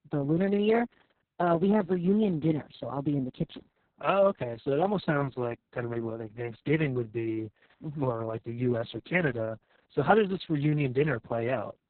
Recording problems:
garbled, watery; badly; nothing above 4 kHz

